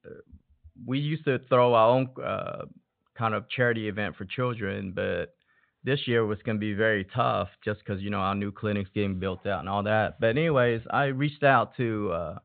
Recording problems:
high frequencies cut off; severe; nothing above 4 kHz

